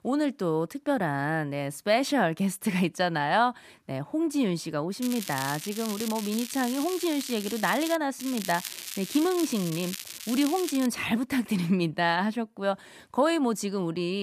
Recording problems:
crackling; loud; from 5 to 8 s and from 8 to 11 s; 9 dB below the speech
abrupt cut into speech; at the end

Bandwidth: 14.5 kHz